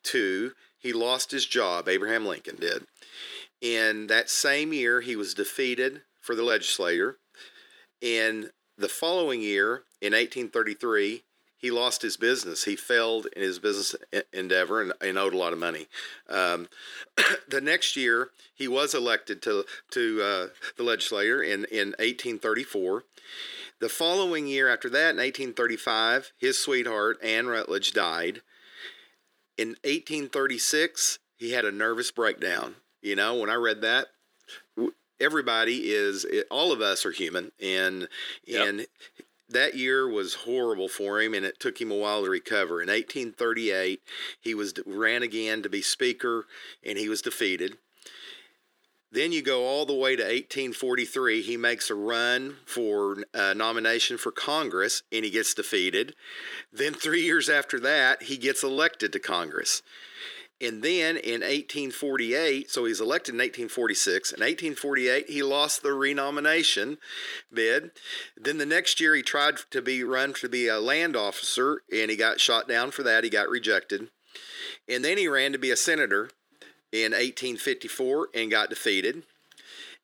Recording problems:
thin; very; fading below 300 Hz

